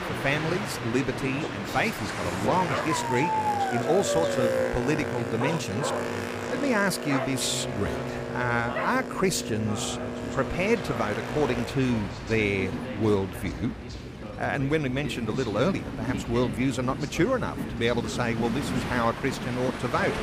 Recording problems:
train or aircraft noise; loud; throughout; 6 dB below the speech
voice in the background; noticeable; throughout; 10 dB below the speech
dog barking; loud; from 2.5 to 10 s; peak 2 dB above the speech

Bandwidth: 15 kHz